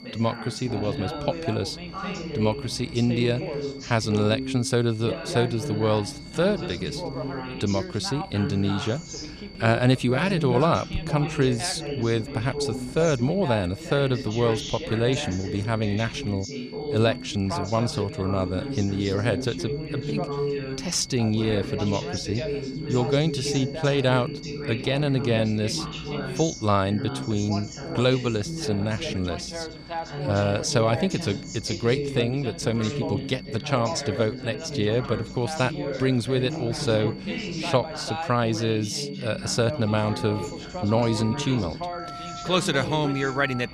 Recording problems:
background chatter; loud; throughout; 2 voices, 7 dB below the speech
alarms or sirens; noticeable; throughout; 20 dB below the speech
high-pitched whine; faint; throughout; 4.5 kHz, 20 dB below the speech

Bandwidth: 15 kHz